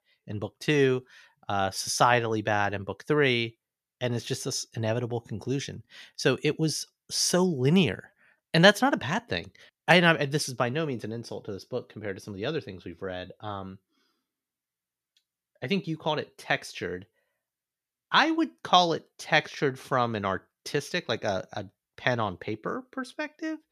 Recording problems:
none

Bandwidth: 14.5 kHz